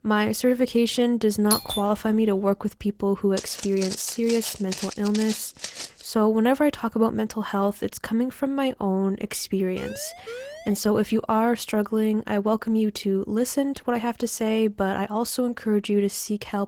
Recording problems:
garbled, watery; slightly; nothing above 18.5 kHz
doorbell; noticeable; at 1.5 s; peak level with the speech
footsteps; noticeable; from 3.5 to 6 s; peak 9 dB below the speech
siren; faint; from 10 to 11 s; peak 10 dB below the speech

